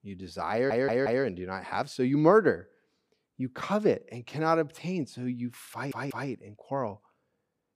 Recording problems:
audio stuttering; at 0.5 s and at 5.5 s

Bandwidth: 15 kHz